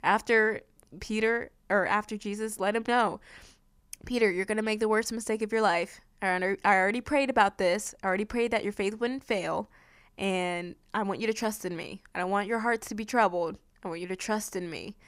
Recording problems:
none

